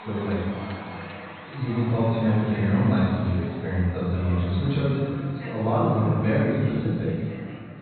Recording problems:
room echo; strong; dies away in 1.8 s
off-mic speech; far
high frequencies cut off; severe; nothing above 4 kHz
chatter from many people; noticeable; throughout; 15 dB below the speech

